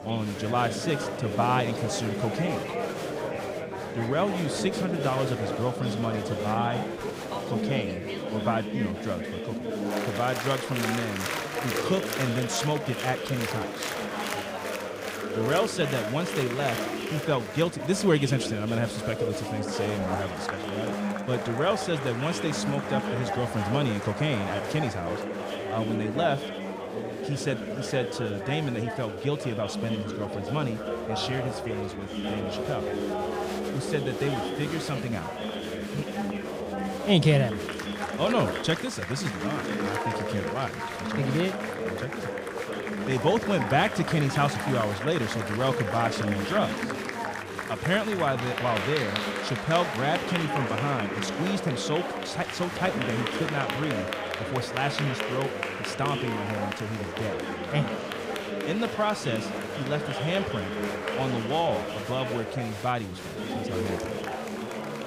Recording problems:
chatter from many people; loud; throughout; 2 dB below the speech

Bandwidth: 15.5 kHz